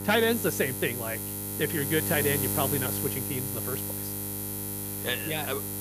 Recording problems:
electrical hum; loud; throughout; 50 Hz, 6 dB below the speech

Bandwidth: 15 kHz